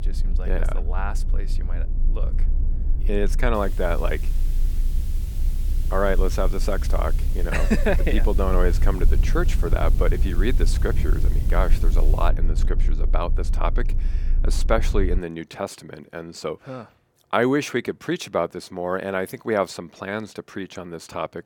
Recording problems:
hiss; noticeable; from 3.5 to 12 s; 20 dB below the speech
low rumble; noticeable; until 15 s; 15 dB below the speech

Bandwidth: 18 kHz